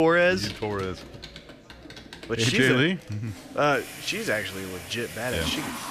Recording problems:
household noises; noticeable; throughout; 15 dB below the speech
chatter from many people; faint; throughout; 25 dB below the speech
abrupt cut into speech; at the start

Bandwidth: 14.5 kHz